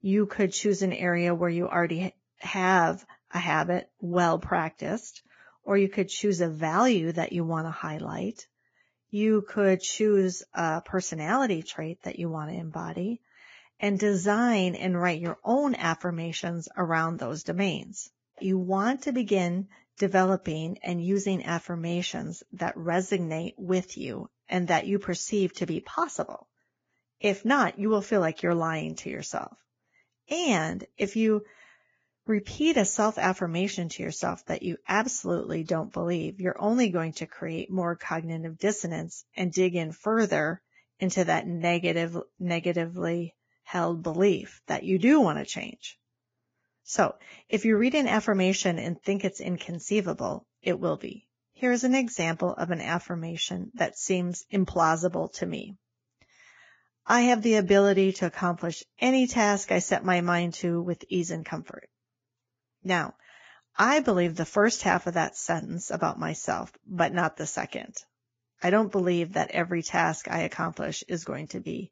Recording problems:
garbled, watery; badly; nothing above 7.5 kHz

